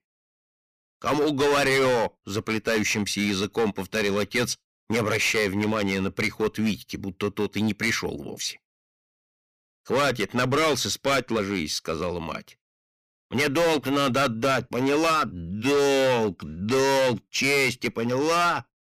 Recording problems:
distortion; heavy; 13% of the sound clipped

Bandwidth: 15 kHz